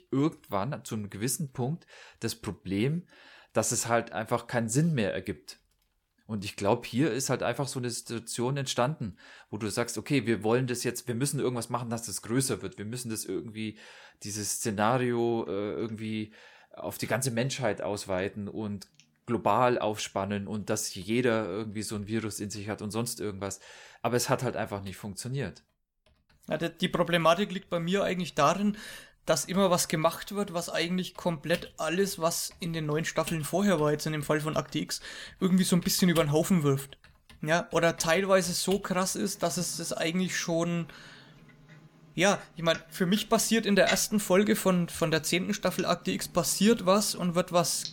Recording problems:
household noises; noticeable; throughout; 15 dB below the speech

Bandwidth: 17 kHz